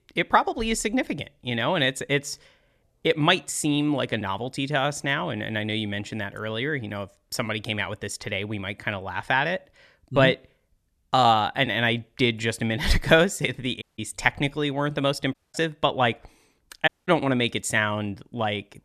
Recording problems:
audio cutting out; at 14 s, at 15 s and at 17 s

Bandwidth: 13.5 kHz